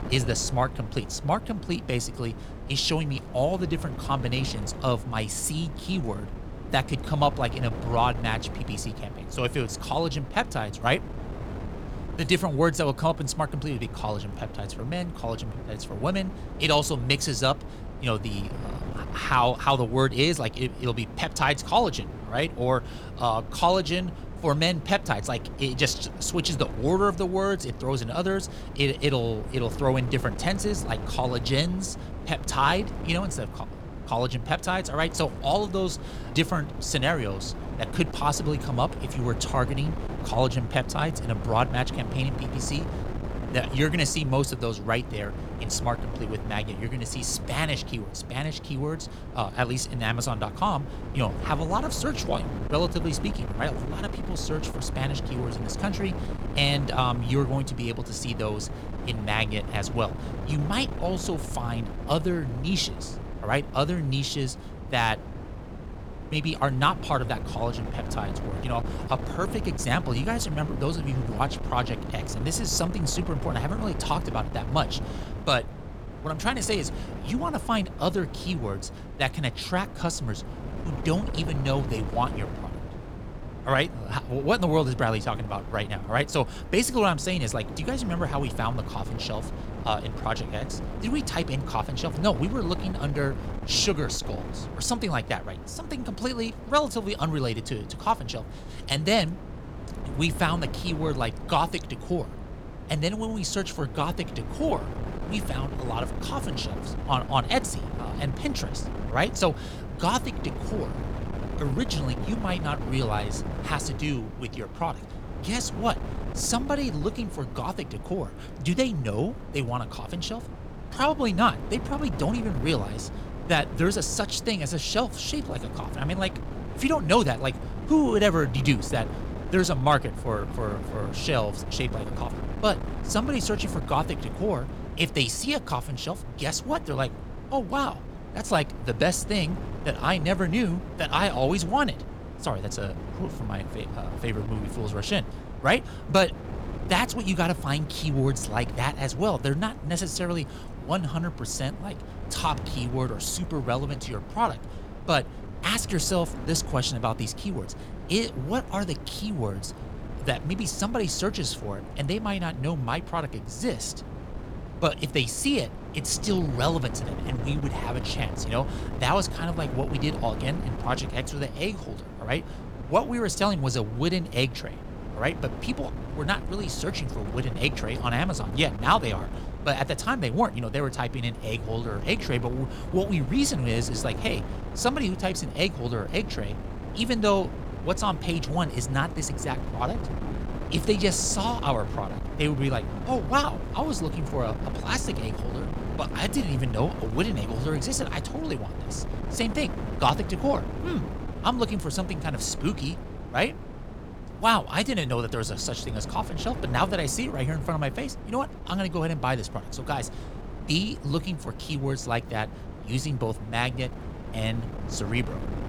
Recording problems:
wind noise on the microphone; occasional gusts; 15 dB below the speech

